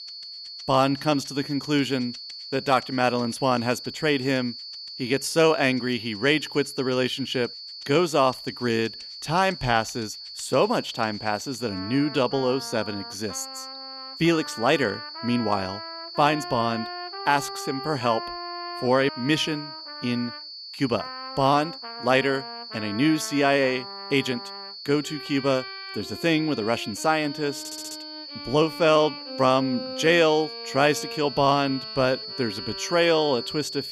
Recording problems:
high-pitched whine; noticeable; throughout; 4.5 kHz, 10 dB below the speech
background music; noticeable; throughout; 15 dB below the speech
audio stuttering; at 28 s

